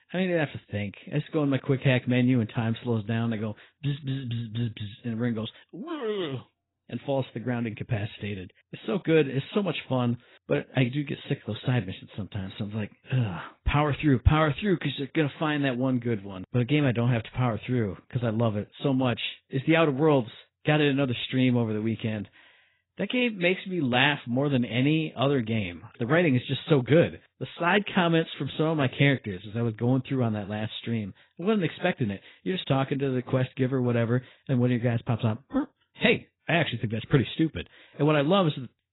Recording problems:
garbled, watery; badly; nothing above 4 kHz

